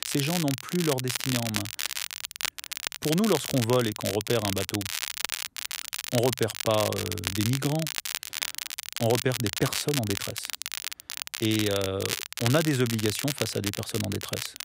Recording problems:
crackle, like an old record; loud; 3 dB below the speech

